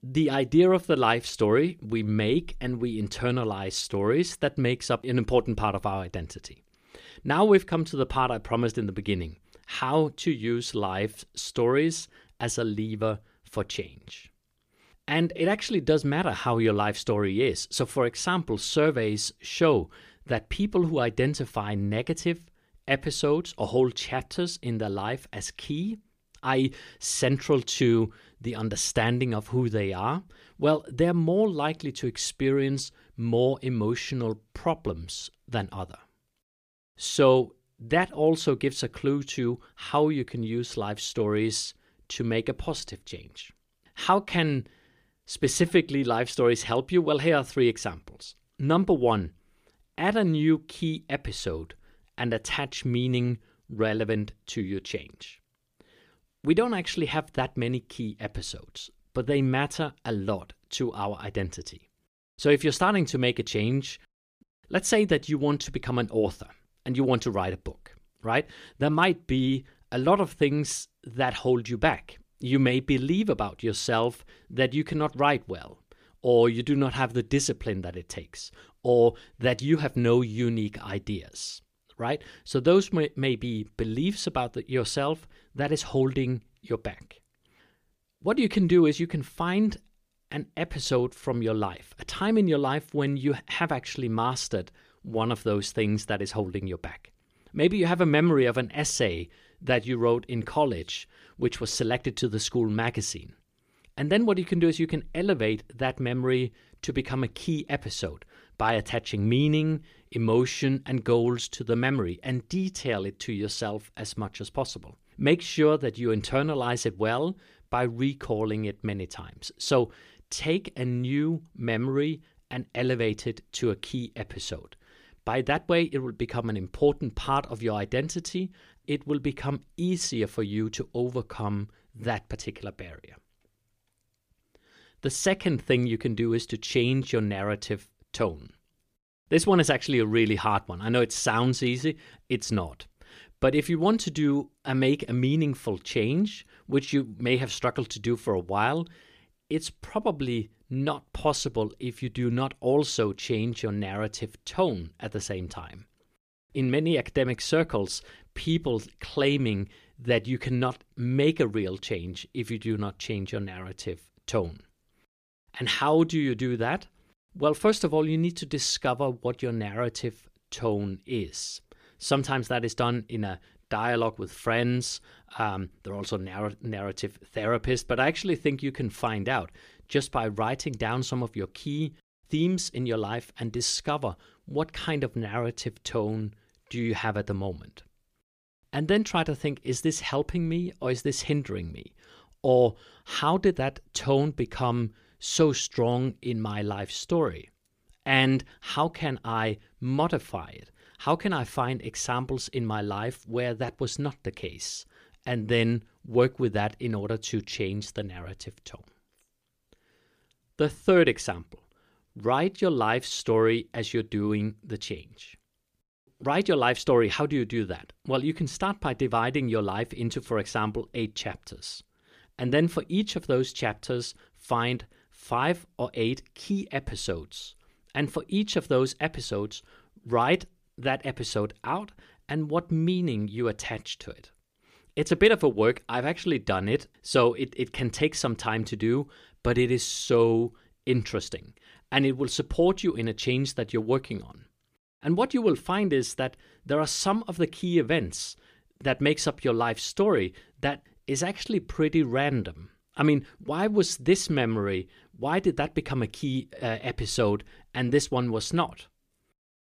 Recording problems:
none

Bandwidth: 15 kHz